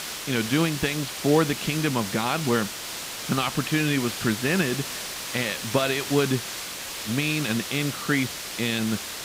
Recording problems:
muffled; very slightly; fading above 3.5 kHz
hiss; loud; throughout; 6 dB below the speech

